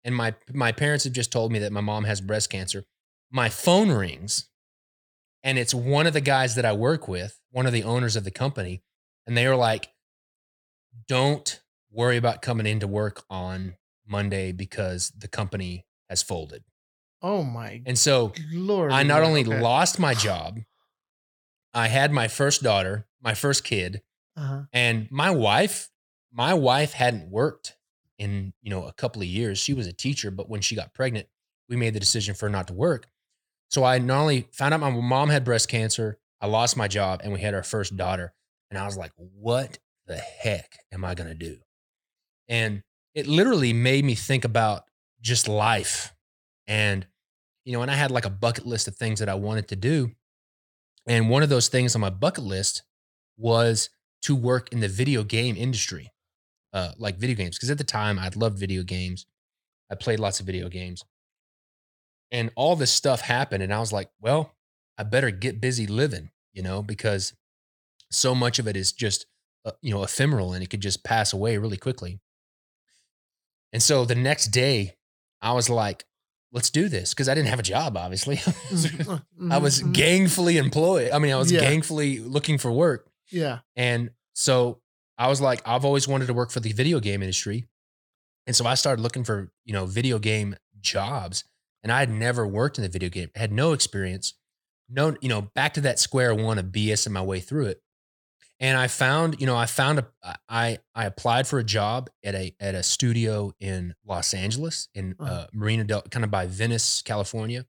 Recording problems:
none

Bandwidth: 19 kHz